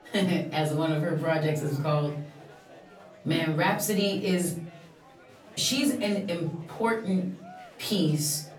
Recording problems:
off-mic speech; far
room echo; slight; dies away in 0.5 s
murmuring crowd; faint; throughout; 20 dB below the speech

